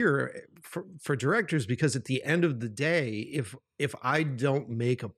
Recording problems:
abrupt cut into speech; at the start

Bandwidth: 13.5 kHz